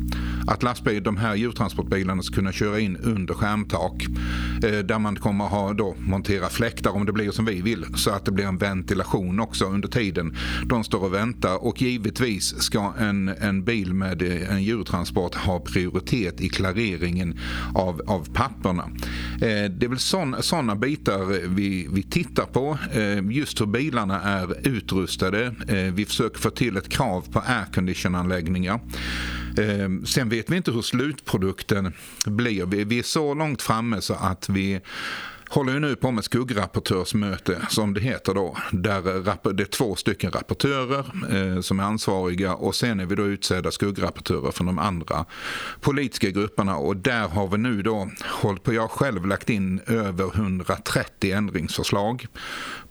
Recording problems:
squashed, flat; somewhat
electrical hum; faint; until 30 s; 60 Hz, 20 dB below the speech

